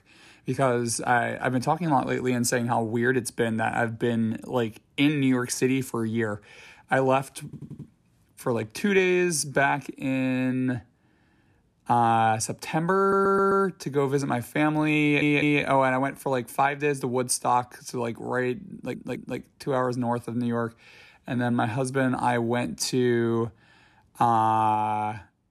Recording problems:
audio stuttering; 4 times, first at 7.5 s

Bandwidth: 14.5 kHz